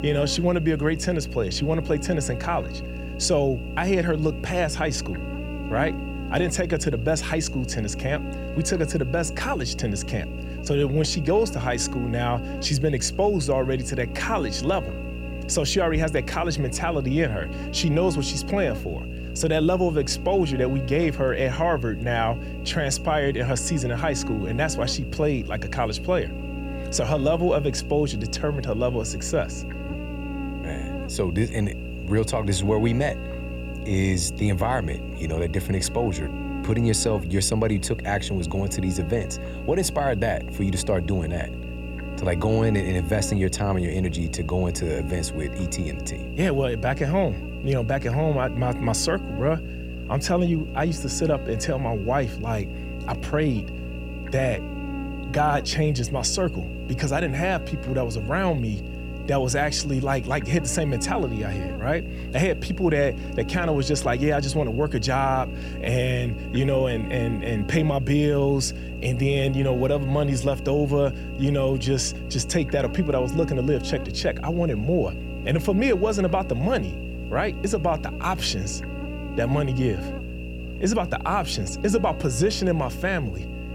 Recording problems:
electrical hum; noticeable; throughout; 60 Hz, 10 dB below the speech

